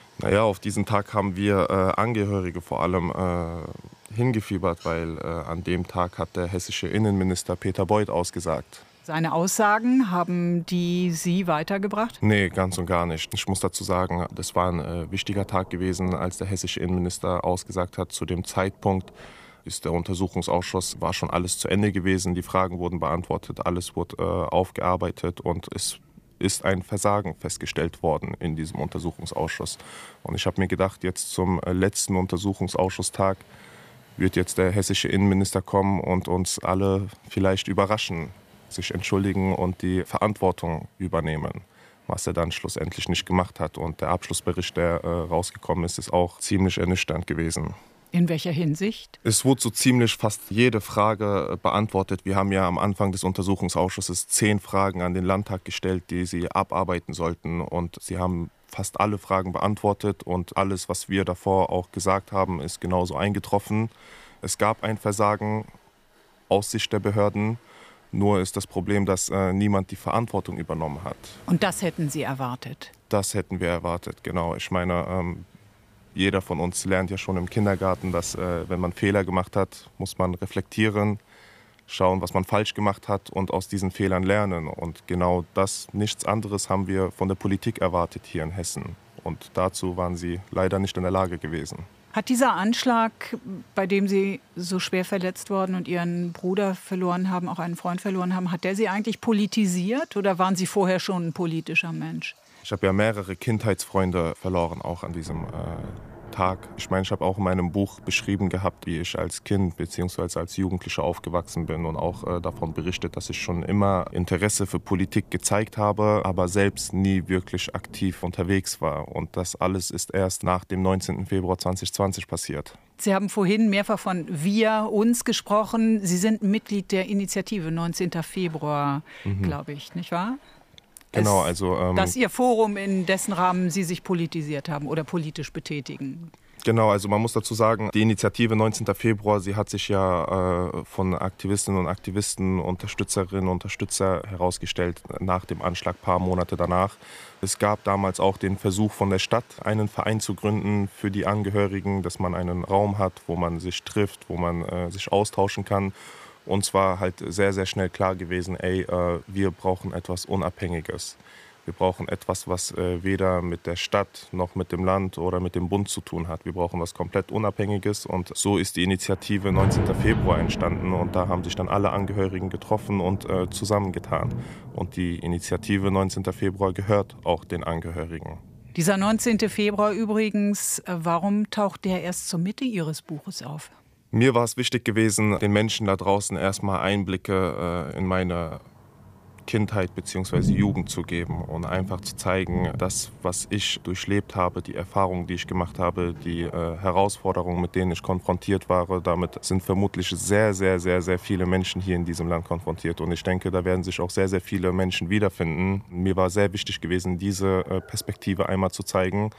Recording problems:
rain or running water; noticeable; throughout; 15 dB below the speech

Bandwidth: 15 kHz